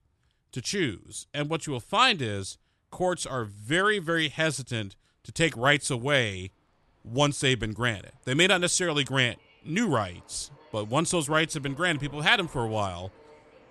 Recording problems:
train or aircraft noise; faint; throughout; 30 dB below the speech

